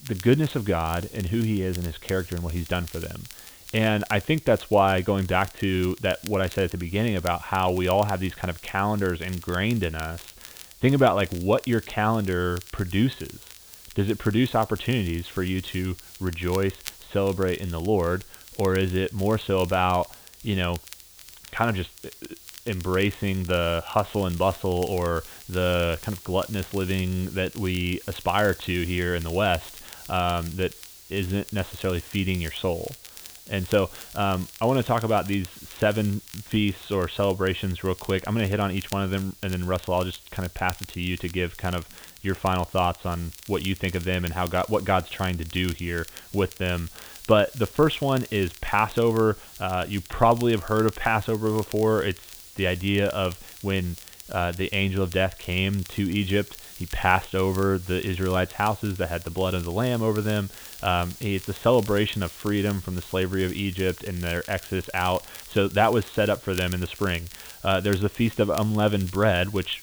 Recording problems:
high frequencies cut off; severe; nothing above 4 kHz
hiss; noticeable; throughout; 20 dB below the speech
crackle, like an old record; noticeable; 20 dB below the speech

